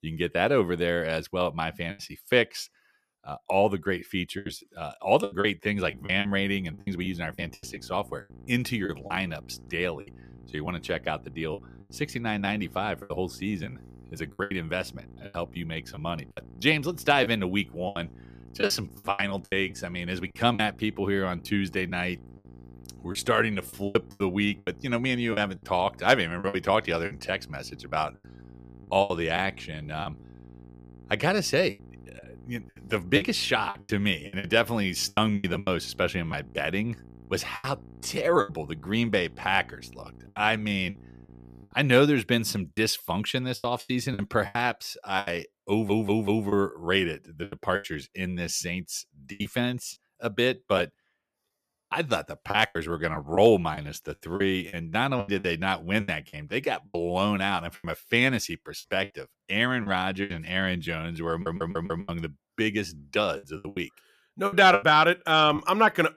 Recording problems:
electrical hum; faint; from 5.5 to 42 s; 60 Hz, 30 dB below the speech
choppy; very; 10% of the speech affected
audio stuttering; at 46 s and at 1:01

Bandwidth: 14.5 kHz